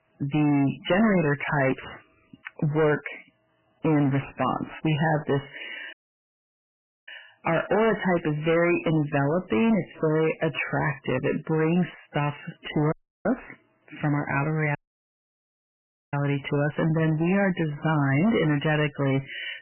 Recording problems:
distortion; heavy; 15% of the sound clipped
garbled, watery; badly; nothing above 3 kHz
audio cutting out; at 6 s for 1 s, at 13 s and at 15 s for 1.5 s

